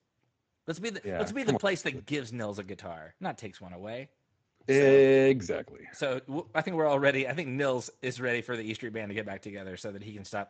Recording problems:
garbled, watery; slightly; nothing above 8 kHz

